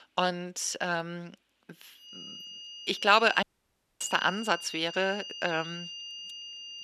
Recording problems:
thin; somewhat; fading below 300 Hz
high-pitched whine; noticeable; from 2 s on; 3 kHz, 10 dB below the speech
audio cutting out; at 3.5 s for 0.5 s

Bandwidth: 13.5 kHz